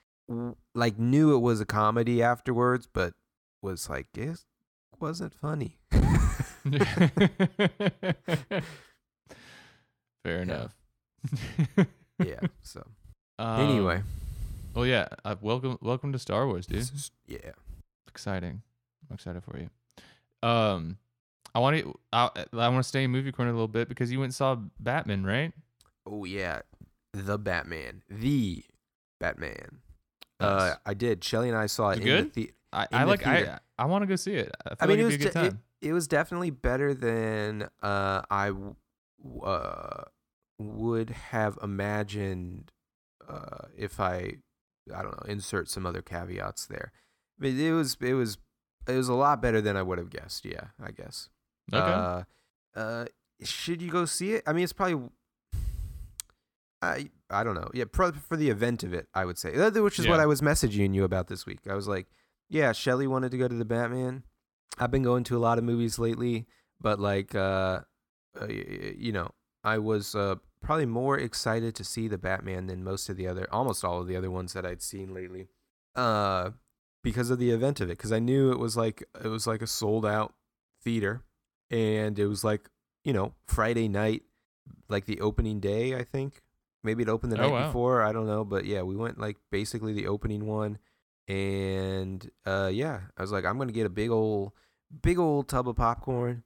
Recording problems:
none

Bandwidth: 17 kHz